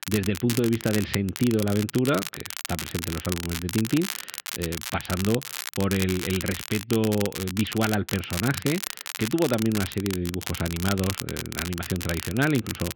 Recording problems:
muffled; very; fading above 3 kHz
crackle, like an old record; loud; 6 dB below the speech

